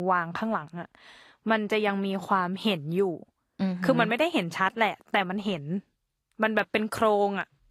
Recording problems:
garbled, watery; slightly; nothing above 12.5 kHz
abrupt cut into speech; at the start

